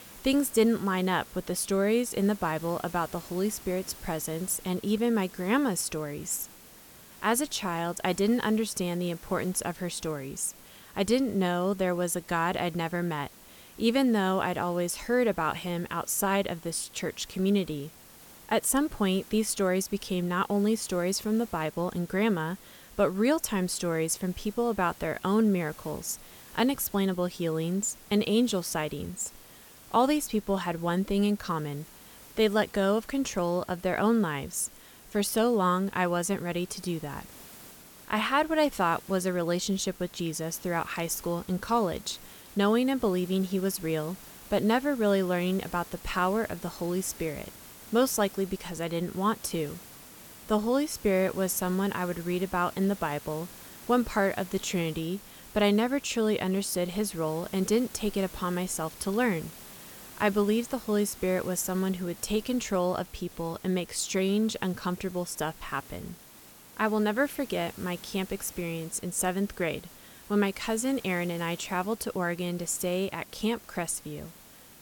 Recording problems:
hiss; noticeable; throughout; 20 dB below the speech

